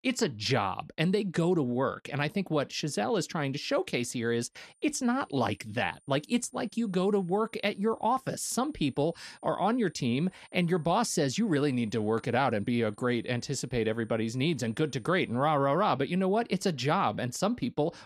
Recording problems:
high-pitched whine; faint; from 4.5 to 15 s; 9 kHz, 35 dB below the speech

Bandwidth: 13.5 kHz